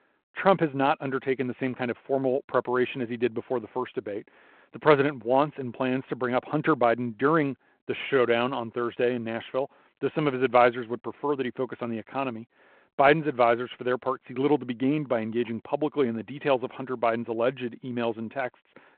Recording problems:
phone-call audio

